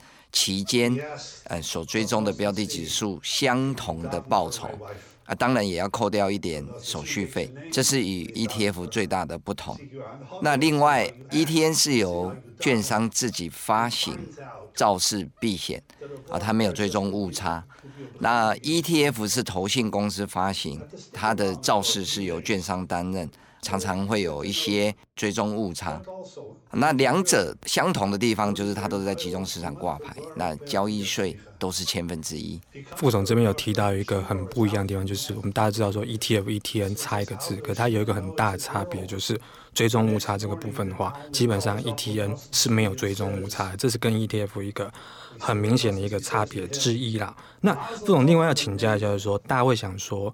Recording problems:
voice in the background; noticeable; throughout; 15 dB below the speech

